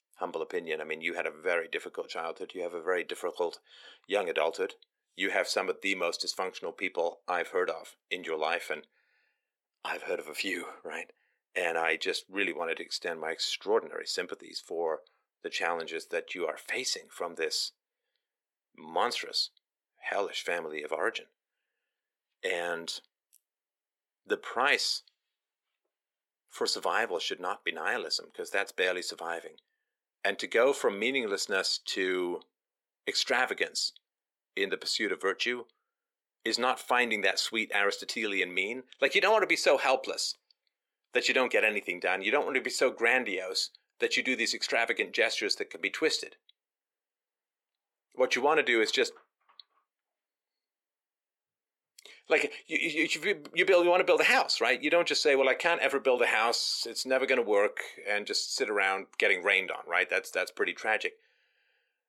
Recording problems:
thin; somewhat; fading below 350 Hz

